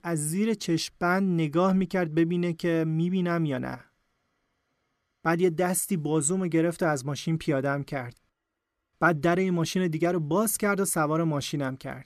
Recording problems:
none

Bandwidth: 13.5 kHz